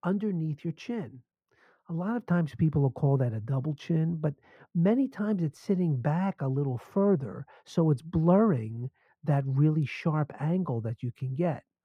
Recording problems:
muffled; very; fading above 3 kHz

